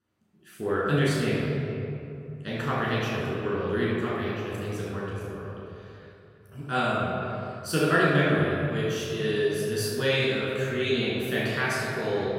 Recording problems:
room echo; strong; dies away in 2.5 s
off-mic speech; far
echo of what is said; noticeable; throughout; 180 ms later, 15 dB below the speech

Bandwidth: 16 kHz